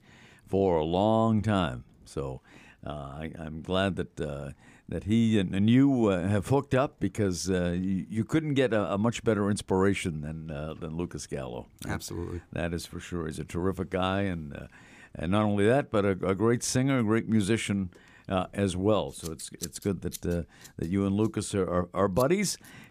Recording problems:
household noises; noticeable; throughout; 20 dB below the speech

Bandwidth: 15 kHz